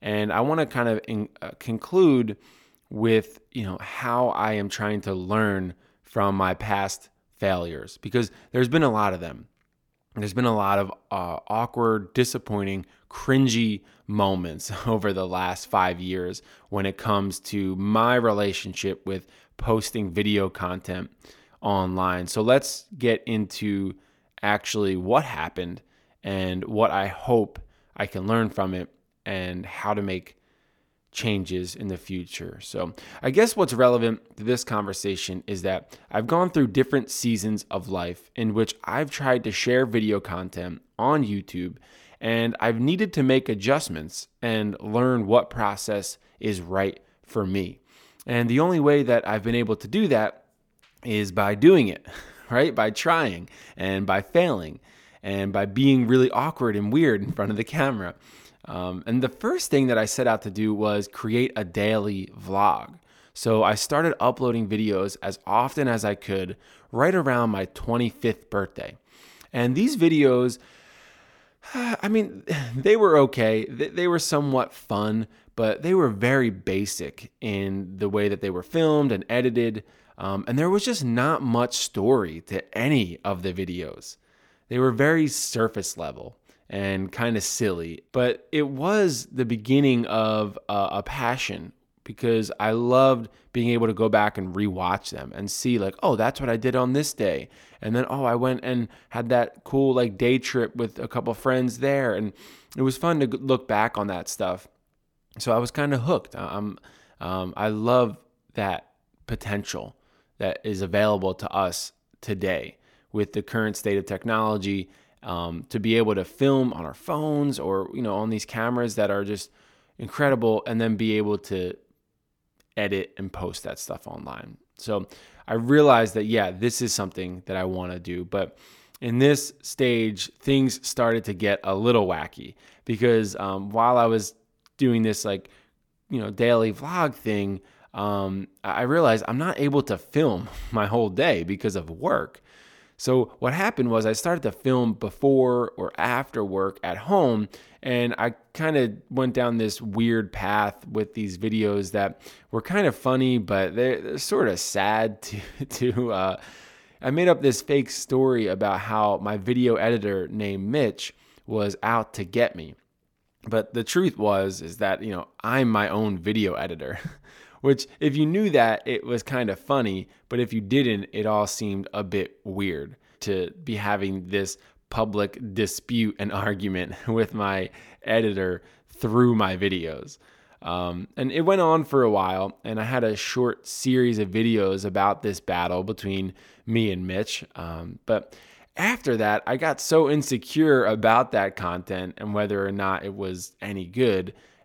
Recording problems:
none

